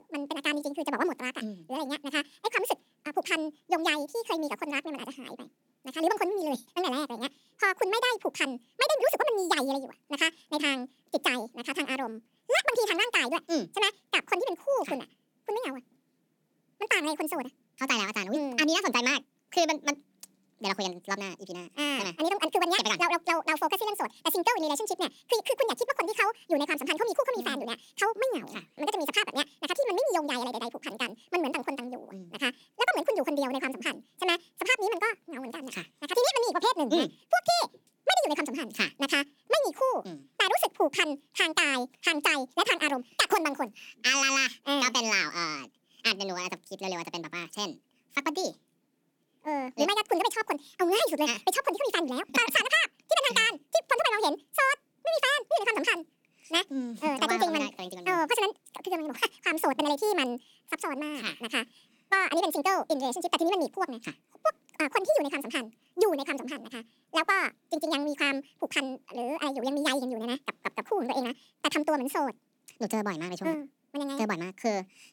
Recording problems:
wrong speed and pitch; too fast and too high; 1.7 times normal speed

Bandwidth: 18 kHz